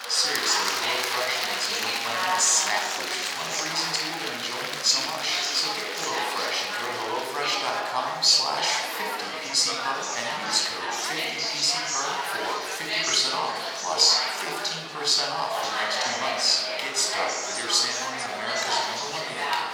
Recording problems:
thin; very; fading below 700 Hz
room echo; noticeable; dies away in 1.1 s
off-mic speech; somewhat distant
chatter from many people; loud; throughout; 2 dB below the speech

